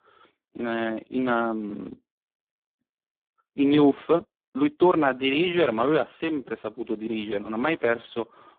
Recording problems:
phone-call audio; poor line
uneven, jittery; strongly; from 0.5 to 8 s

